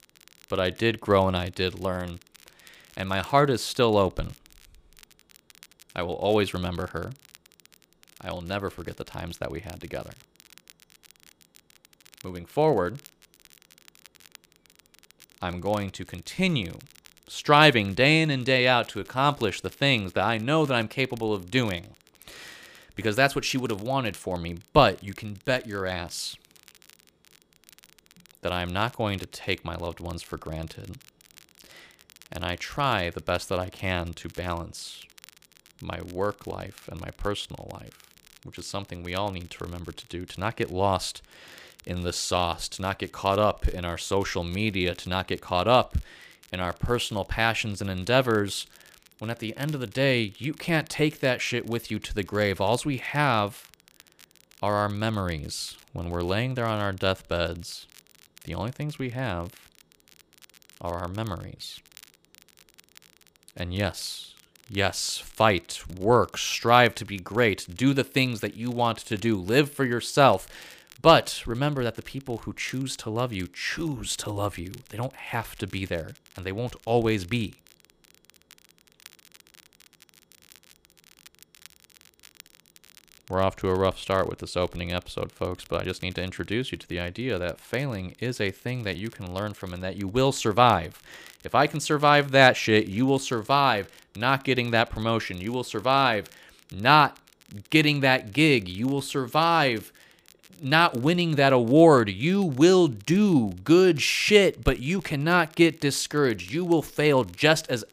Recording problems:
crackle, like an old record; faint; 30 dB below the speech

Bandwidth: 15 kHz